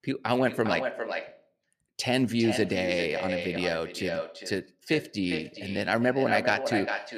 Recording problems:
echo of what is said; strong; throughout; 400 ms later, 6 dB below the speech

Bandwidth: 14.5 kHz